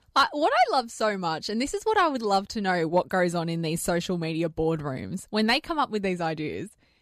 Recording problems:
none

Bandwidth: 14.5 kHz